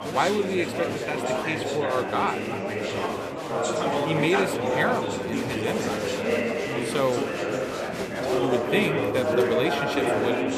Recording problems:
chatter from many people; very loud; throughout; 2 dB above the speech

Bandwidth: 14.5 kHz